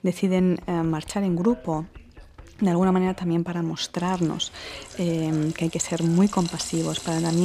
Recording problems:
household noises; noticeable; throughout; 15 dB below the speech
background chatter; faint; throughout; 3 voices, 25 dB below the speech
abrupt cut into speech; at the end

